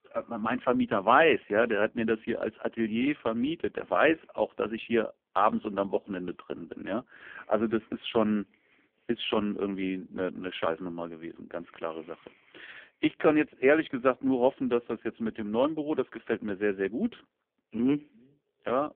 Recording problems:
phone-call audio; poor line; nothing above 3.5 kHz

